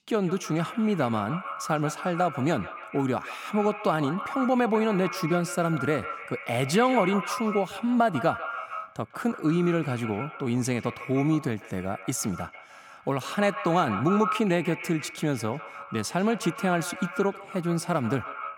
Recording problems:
echo of what is said; strong; throughout; 150 ms later, 10 dB below the speech

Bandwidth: 17 kHz